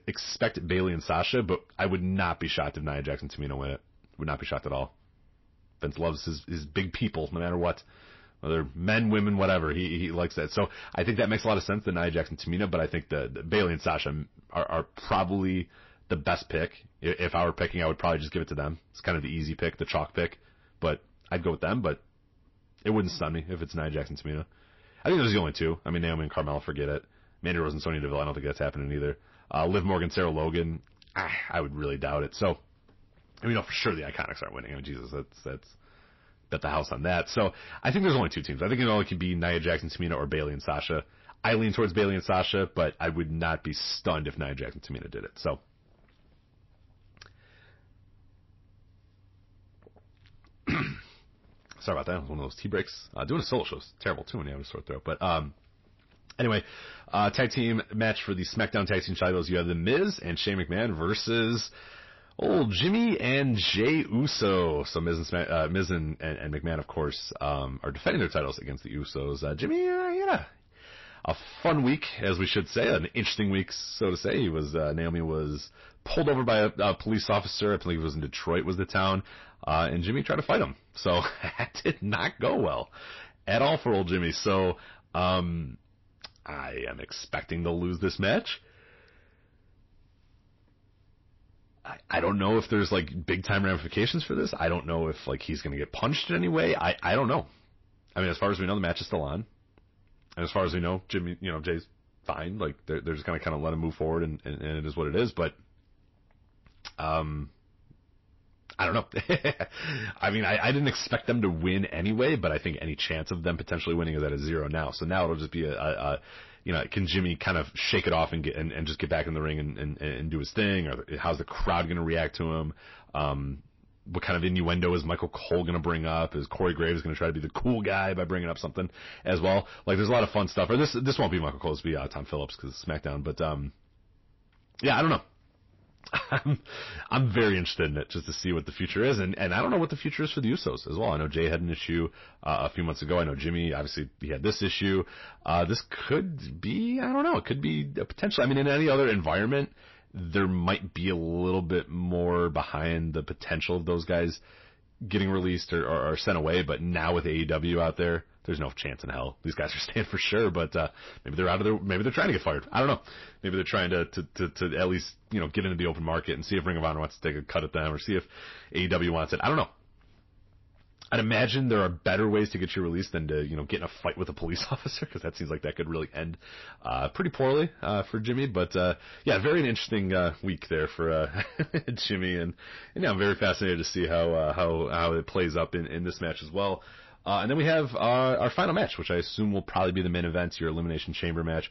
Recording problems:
distortion; slight; 10 dB below the speech
garbled, watery; slightly; nothing above 5.5 kHz

